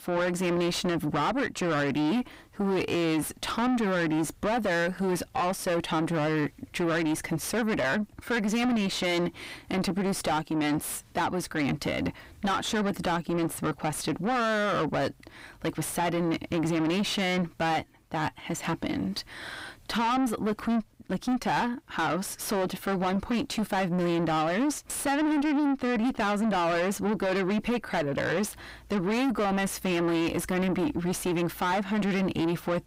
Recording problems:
distortion; heavy; 6 dB below the speech

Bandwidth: 15.5 kHz